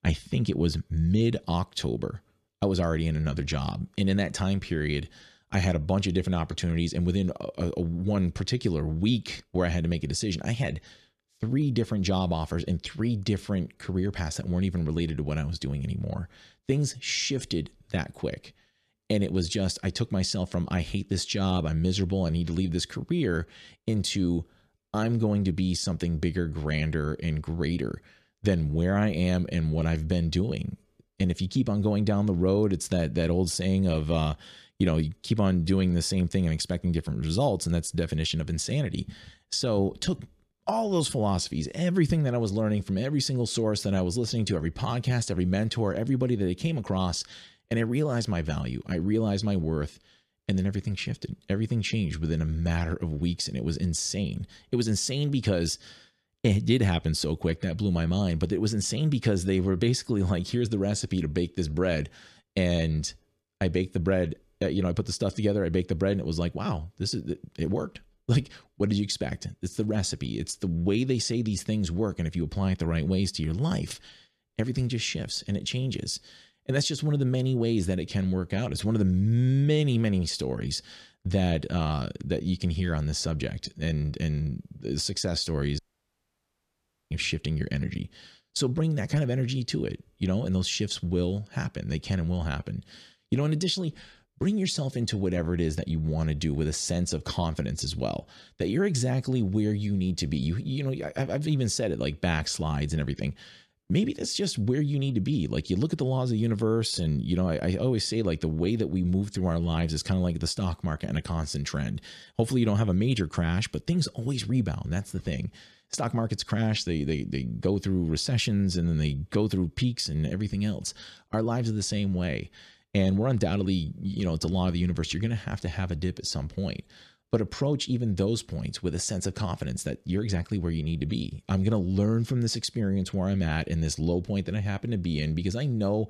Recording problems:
audio cutting out; at 1:26 for 1.5 s

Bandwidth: 14 kHz